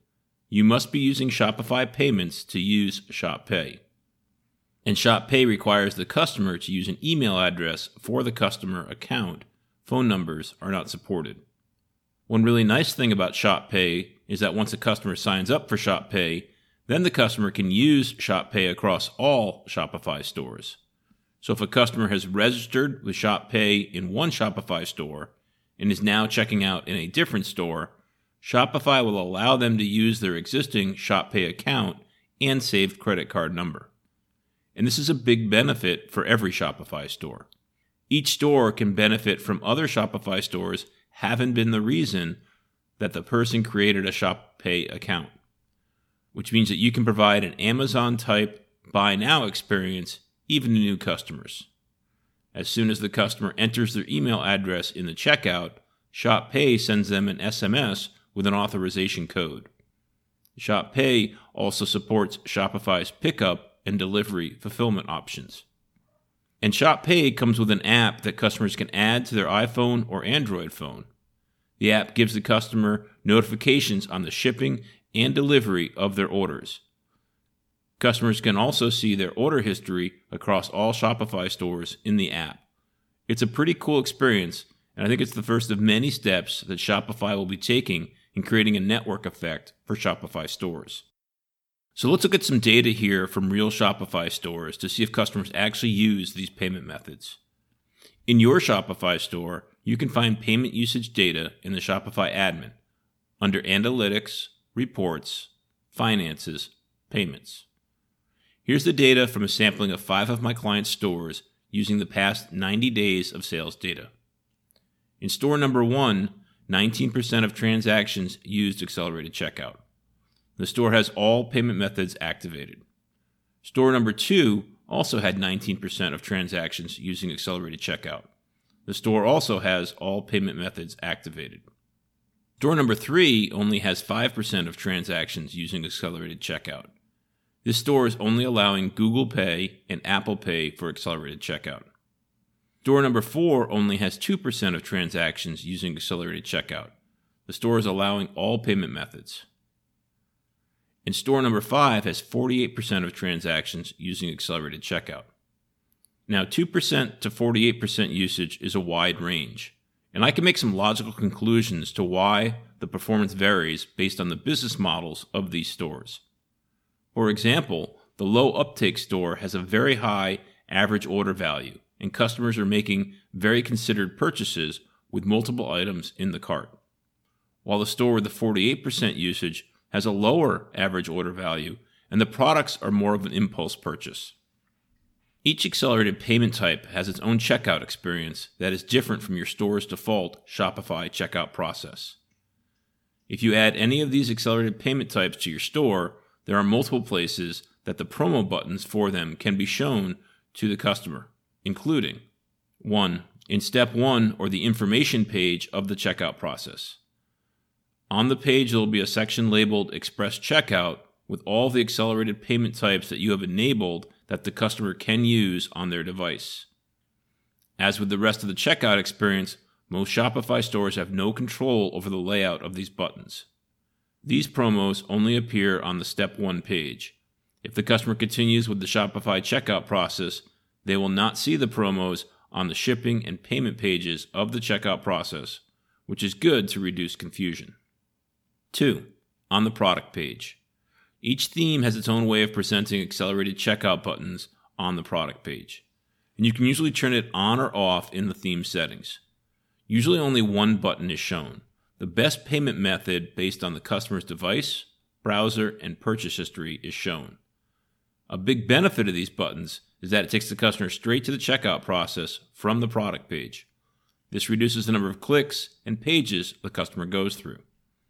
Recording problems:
none

